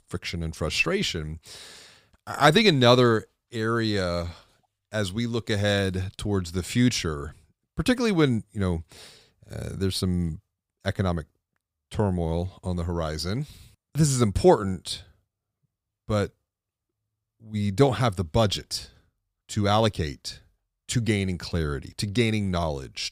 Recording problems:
none

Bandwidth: 15.5 kHz